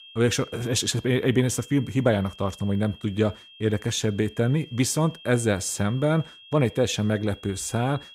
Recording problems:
high-pitched whine; faint; throughout; 3 kHz, 20 dB below the speech

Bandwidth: 15.5 kHz